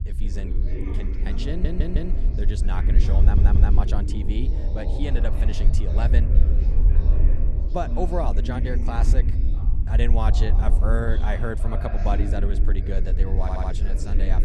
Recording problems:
background chatter; loud; throughout; 3 voices, 7 dB below the speech
low rumble; loud; throughout; 10 dB below the speech
audio stuttering; at 1.5 s, at 3 s and at 13 s

